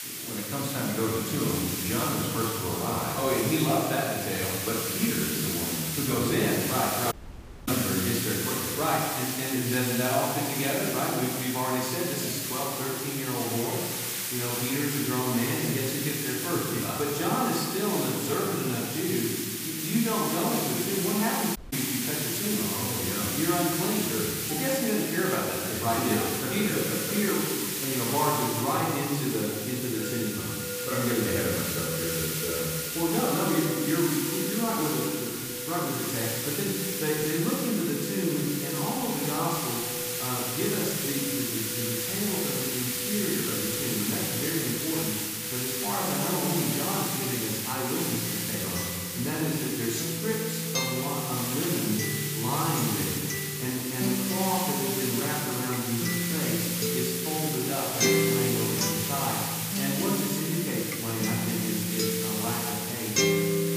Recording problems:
off-mic speech; far
room echo; noticeable; dies away in 1.5 s
background music; loud; throughout; 5 dB below the speech
hiss; loud; throughout; as loud as the speech
audio cutting out; at 7 s for 0.5 s and at 22 s

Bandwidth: 15 kHz